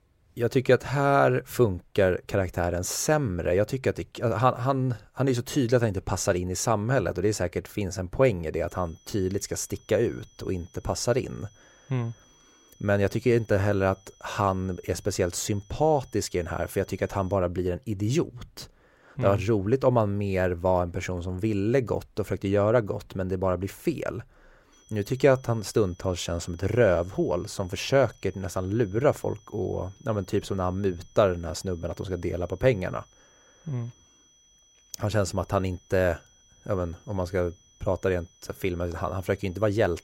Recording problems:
high-pitched whine; faint; from 8.5 to 17 s and from 25 s on; 6 kHz, 30 dB below the speech

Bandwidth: 16 kHz